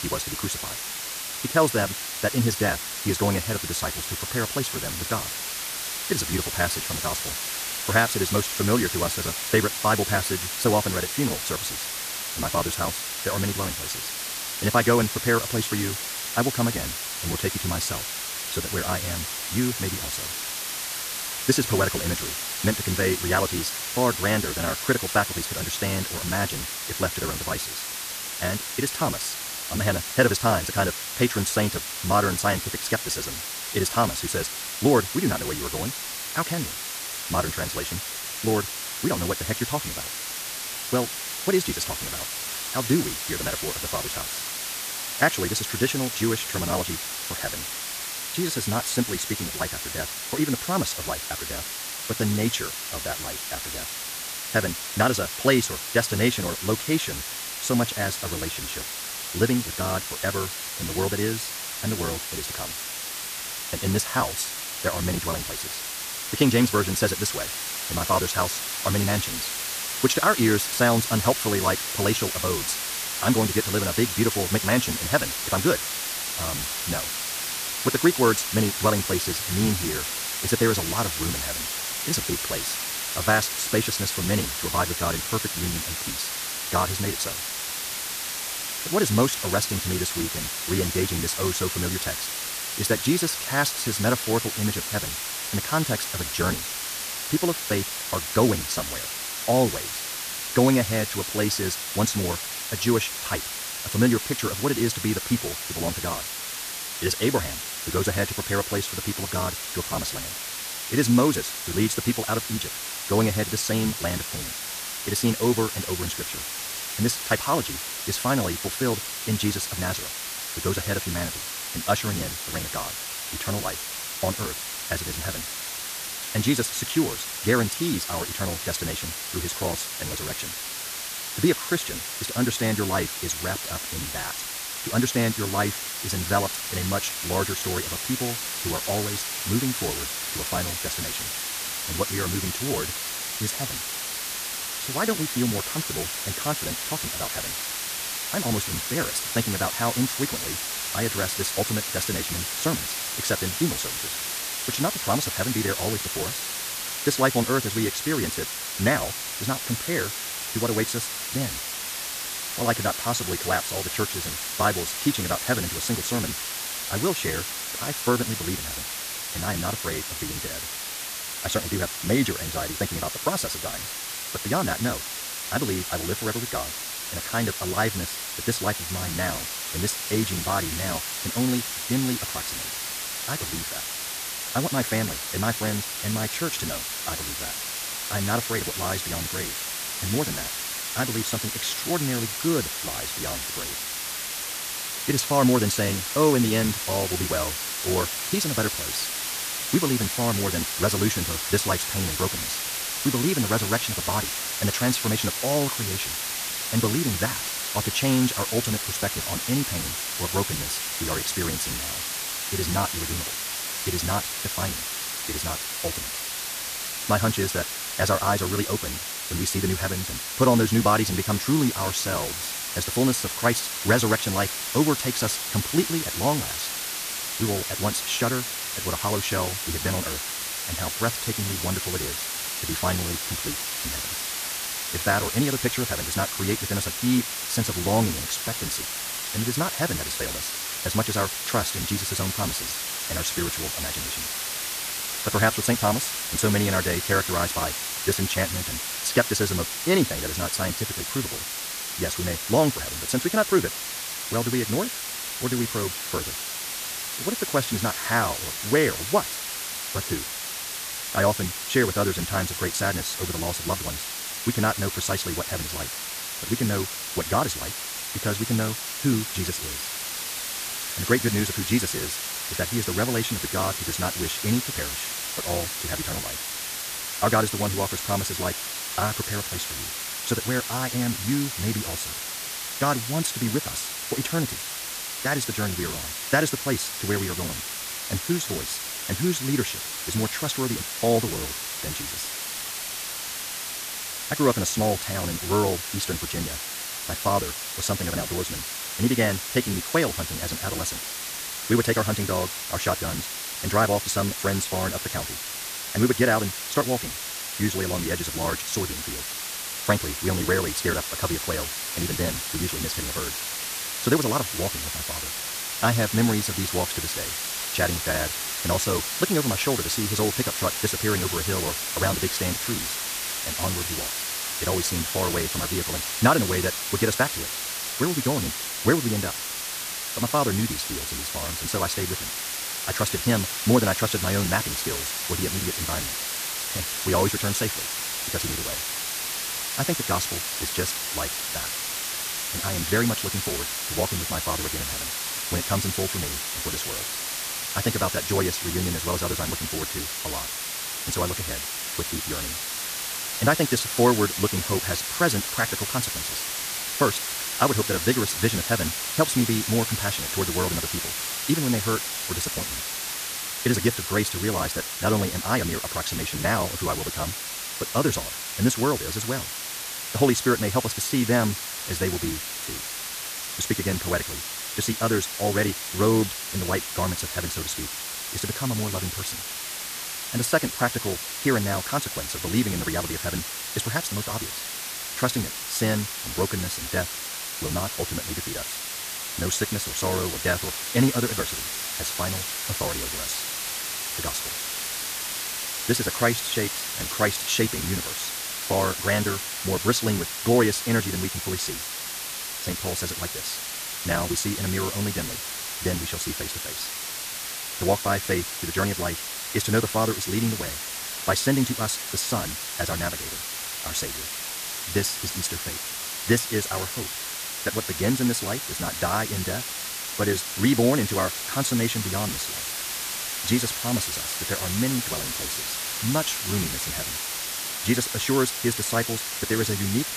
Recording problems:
wrong speed, natural pitch; too fast; 1.6 times normal speed
hiss; loud; throughout; 2 dB below the speech

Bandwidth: 14.5 kHz